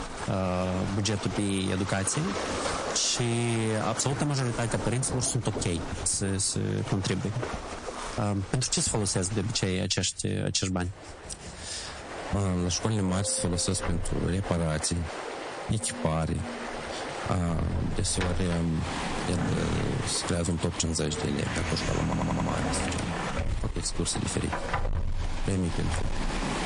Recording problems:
distortion; slight; 7% of the sound clipped
garbled, watery; slightly; nothing above 8.5 kHz
squashed, flat; somewhat, background pumping
household noises; loud; throughout; 8 dB below the speech
rain or running water; loud; throughout; 9 dB below the speech
audio stuttering; at 22 s

